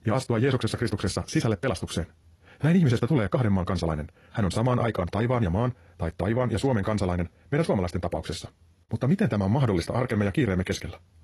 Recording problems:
wrong speed, natural pitch; too fast; 1.8 times normal speed
garbled, watery; slightly; nothing above 11 kHz

